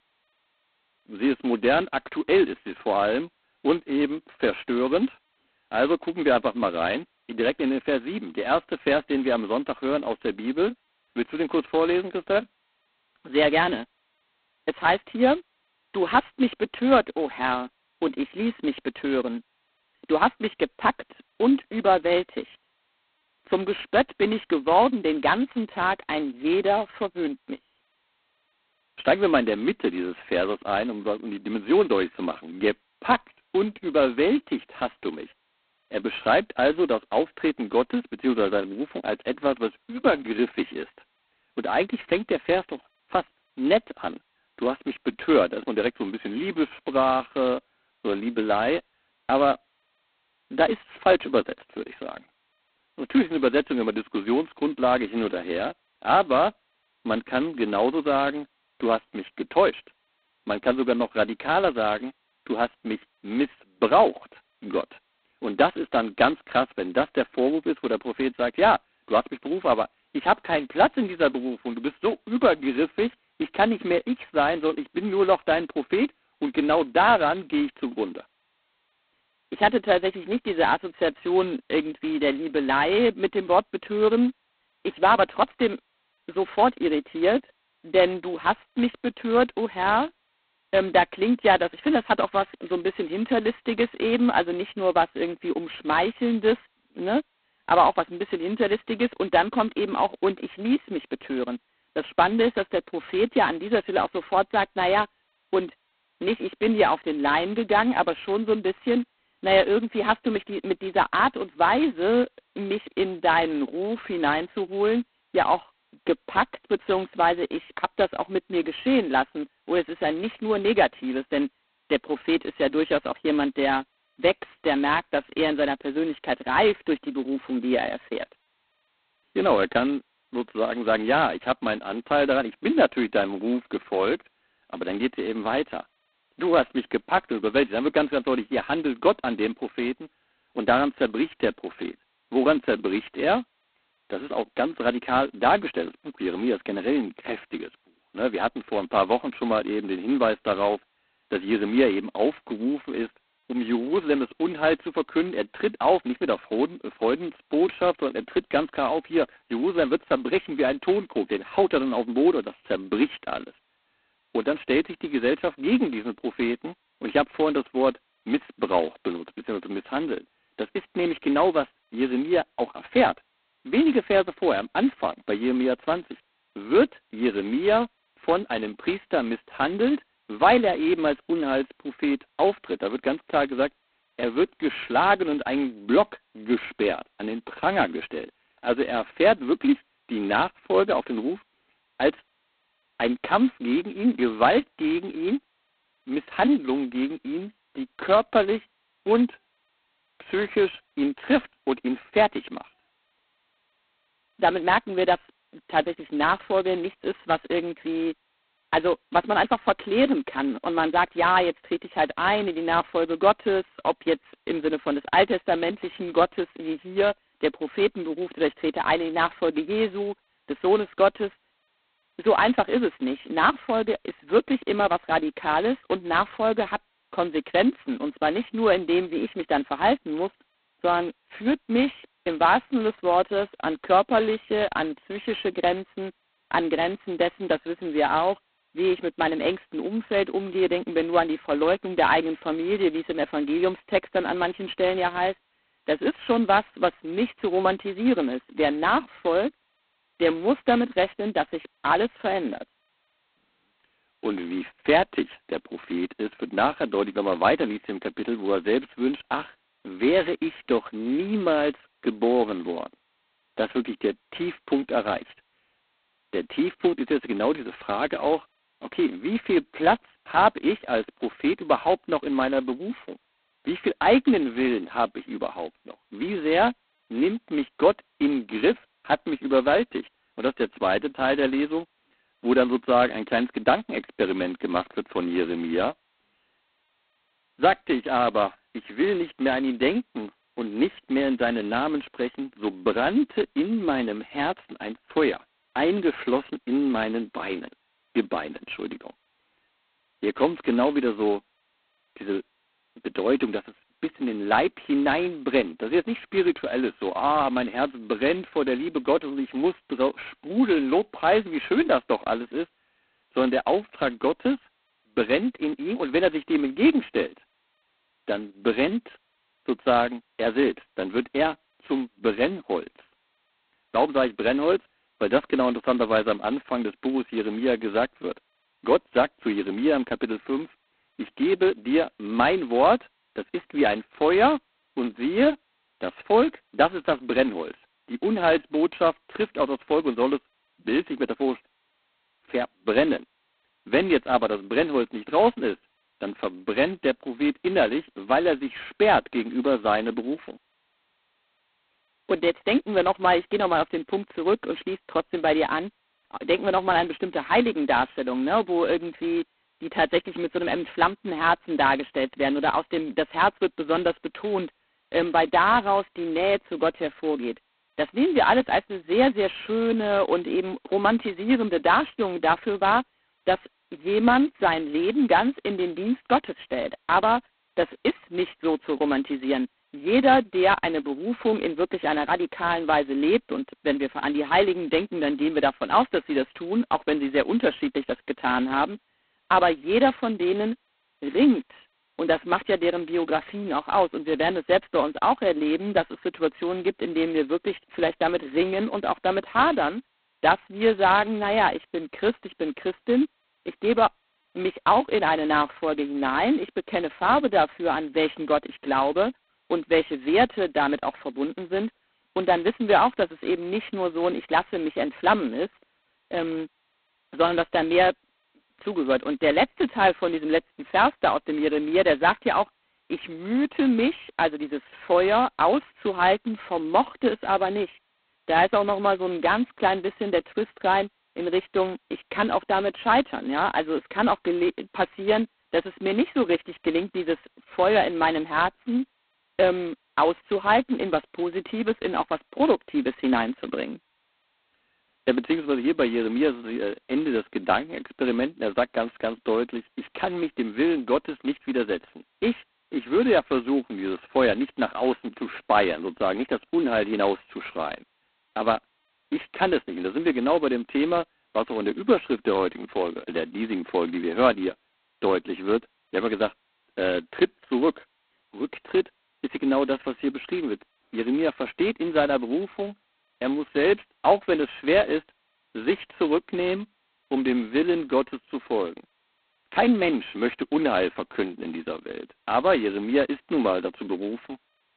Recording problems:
phone-call audio; poor line; nothing above 4 kHz

